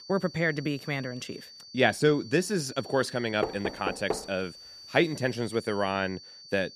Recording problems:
high-pitched whine; noticeable; throughout; 4.5 kHz, 15 dB below the speech
door banging; noticeable; at 3.5 s; peak 5 dB below the speech

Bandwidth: 14.5 kHz